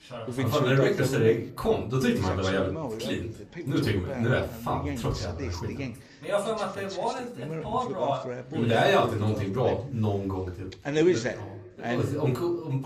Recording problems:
off-mic speech; far
room echo; slight; dies away in 0.3 s
voice in the background; loud; throughout; 6 dB below the speech

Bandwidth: 14.5 kHz